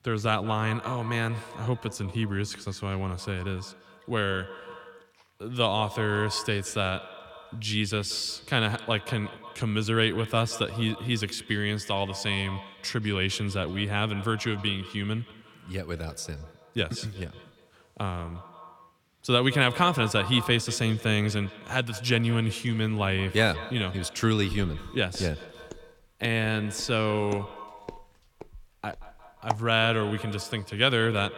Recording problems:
echo of what is said; noticeable; throughout; 180 ms later, 15 dB below the speech
footsteps; noticeable; from 25 to 30 s; peak 6 dB below the speech

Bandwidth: 17.5 kHz